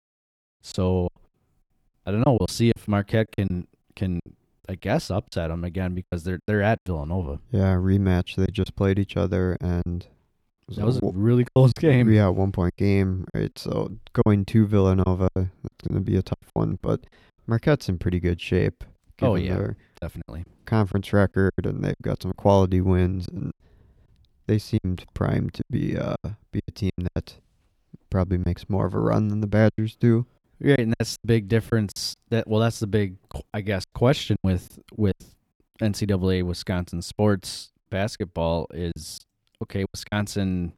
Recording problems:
choppy; very; 9% of the speech affected

